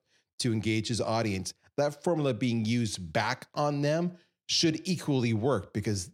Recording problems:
none

